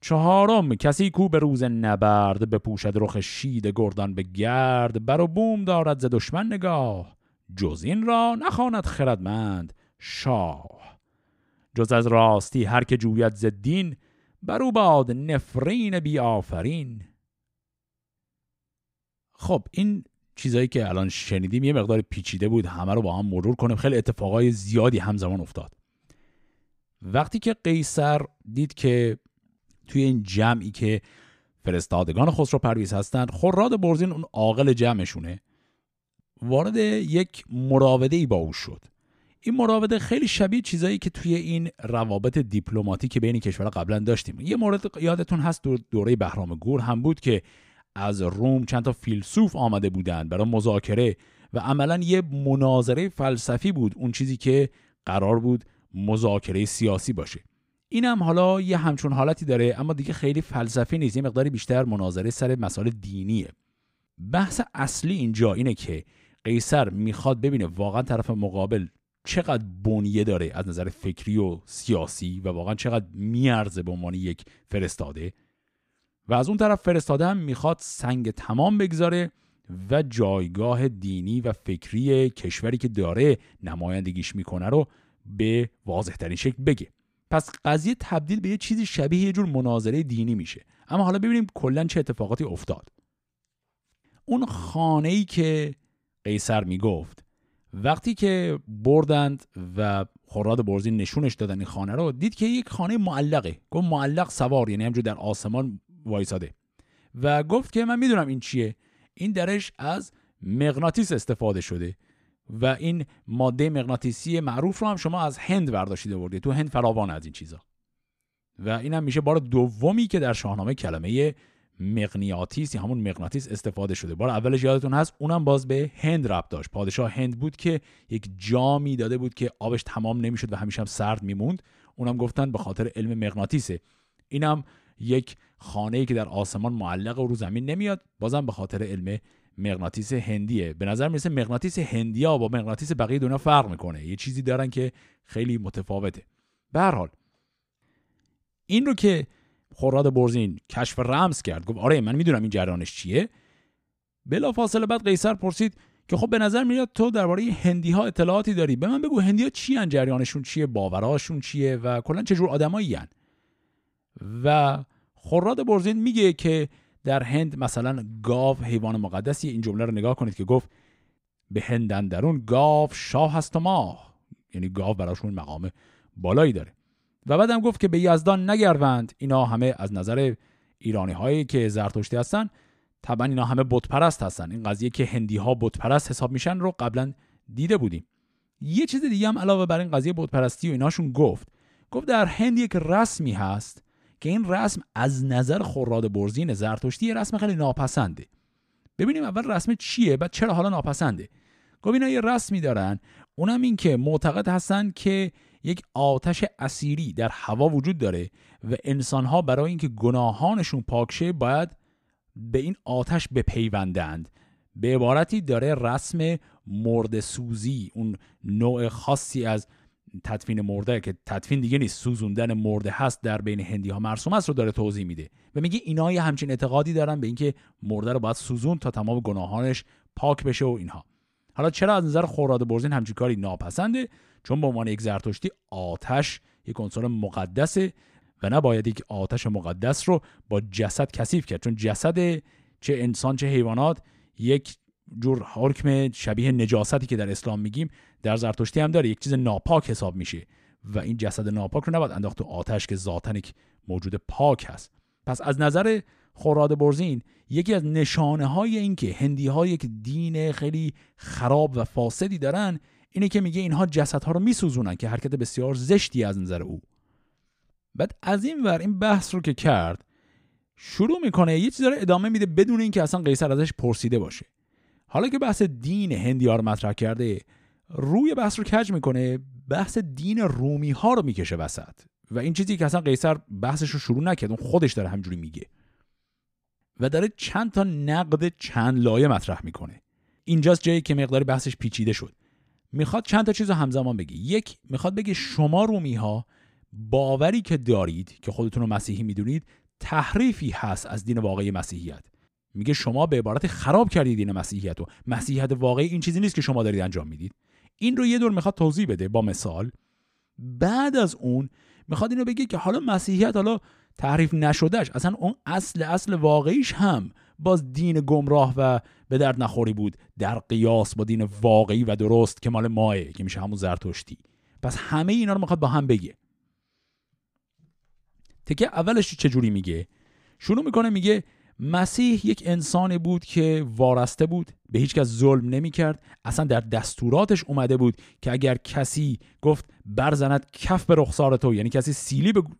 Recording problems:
none

